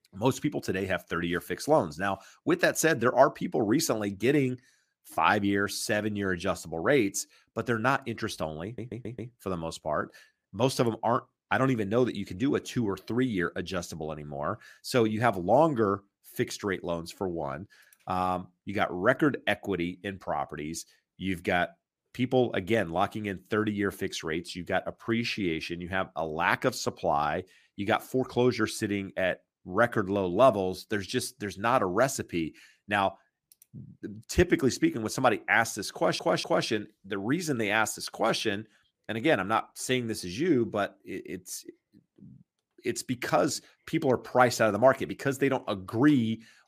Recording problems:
audio stuttering; at 8.5 s and at 36 s

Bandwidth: 15 kHz